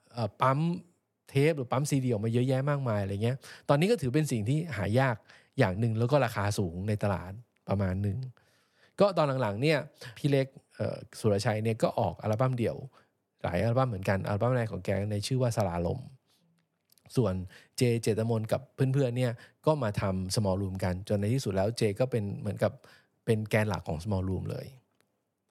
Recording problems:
none

